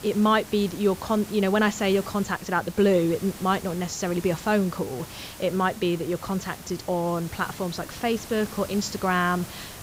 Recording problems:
high frequencies cut off; noticeable; nothing above 8 kHz
hiss; noticeable; throughout; 15 dB below the speech

